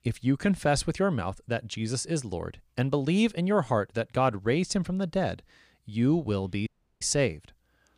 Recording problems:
audio cutting out; at 6.5 s

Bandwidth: 15 kHz